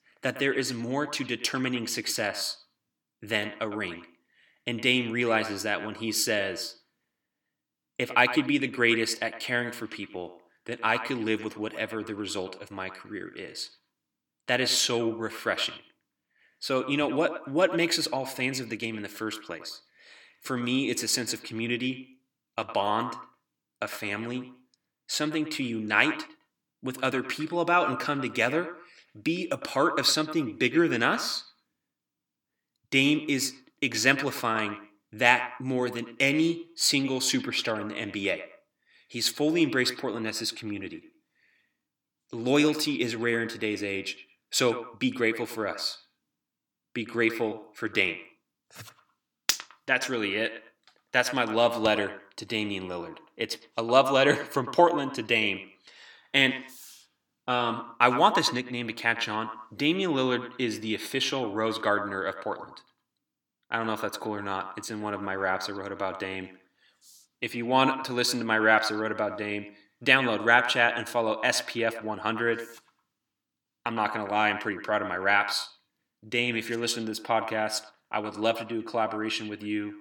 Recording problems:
echo of what is said; noticeable; throughout; 110 ms later, 10 dB below the speech

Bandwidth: 18 kHz